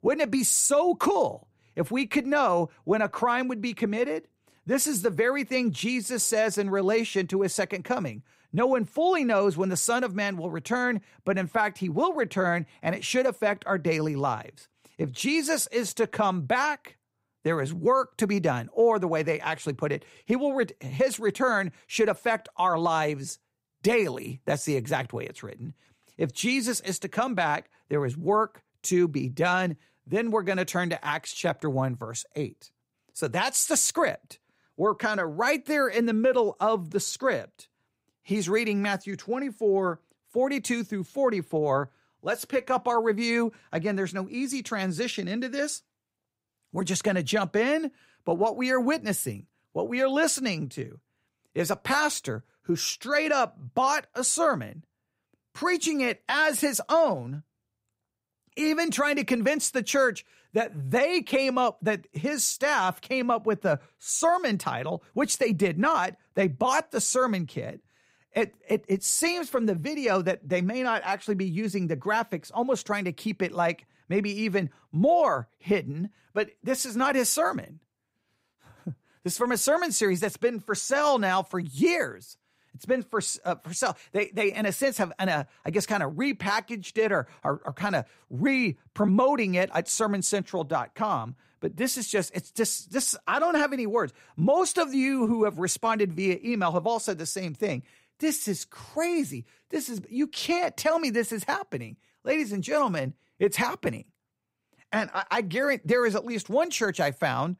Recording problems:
none

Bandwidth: 15.5 kHz